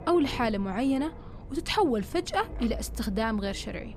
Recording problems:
wind noise on the microphone; occasional gusts; 20 dB below the speech

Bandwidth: 14.5 kHz